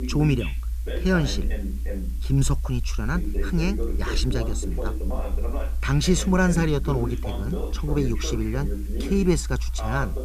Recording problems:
voice in the background; loud; throughout; 10 dB below the speech
hiss; faint; throughout; 25 dB below the speech
low rumble; faint; throughout; 25 dB below the speech

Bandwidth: 14.5 kHz